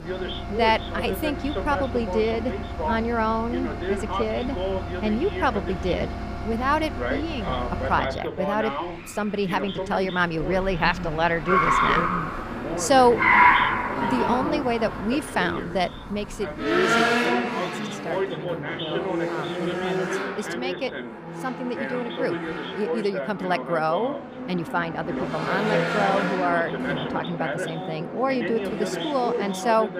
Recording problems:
traffic noise; loud; throughout; 1 dB below the speech
voice in the background; loud; throughout; 6 dB below the speech

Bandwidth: 15 kHz